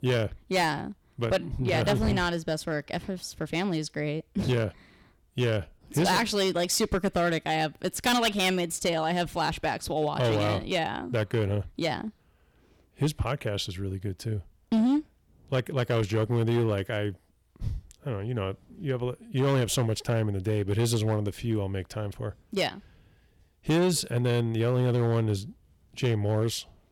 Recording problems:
distortion; slight; 6% of the sound clipped

